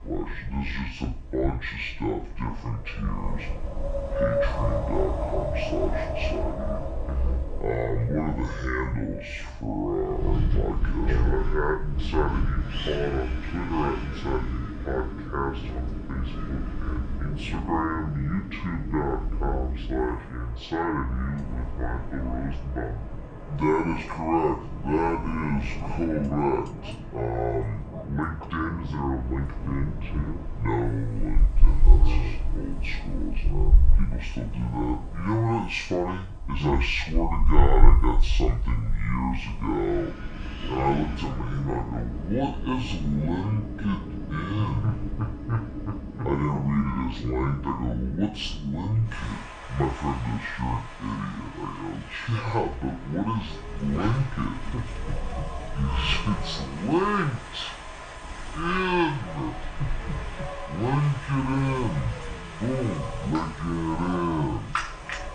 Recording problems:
wrong speed and pitch; too slow and too low; 0.6 times normal speed
room echo; slight; dies away in 0.4 s
off-mic speech; somewhat distant
wind in the background; loud; throughout; 3 dB below the speech

